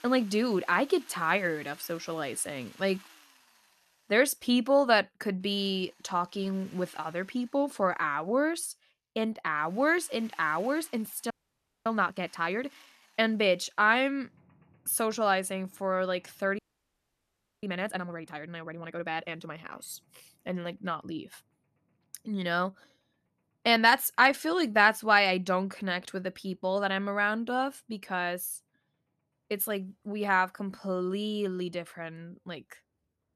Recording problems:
machinery noise; faint; throughout; 30 dB below the speech
audio freezing; at 11 s for 0.5 s and at 17 s for 1 s

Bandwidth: 13.5 kHz